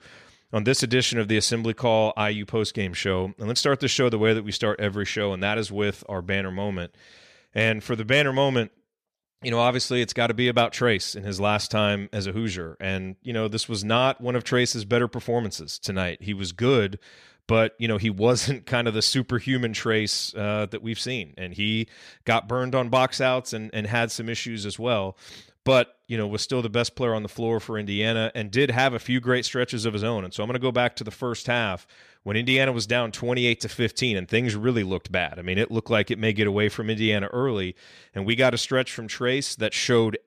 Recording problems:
none

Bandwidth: 14.5 kHz